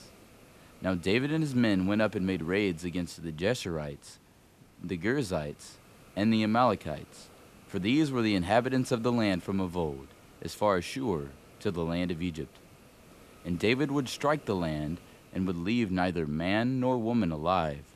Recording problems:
hiss; faint; throughout; 25 dB below the speech

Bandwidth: 14 kHz